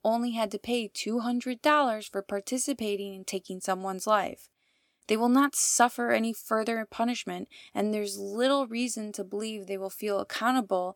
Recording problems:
none

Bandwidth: 18 kHz